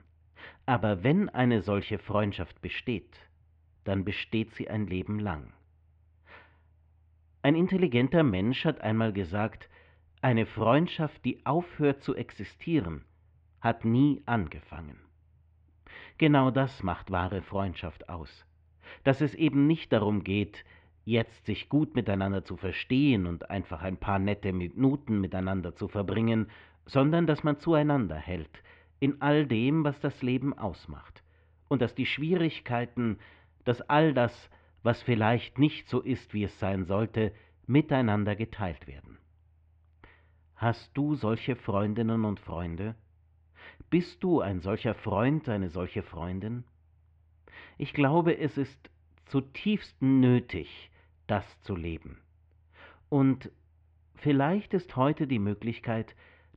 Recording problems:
muffled; very; fading above 2.5 kHz

